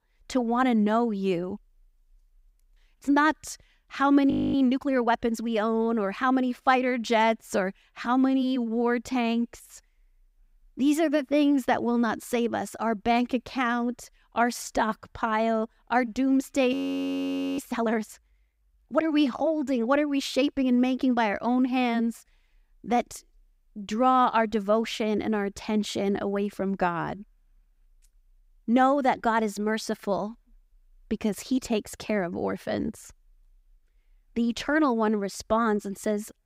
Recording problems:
audio freezing; at 4.5 s and at 17 s for 1 s

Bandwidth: 15.5 kHz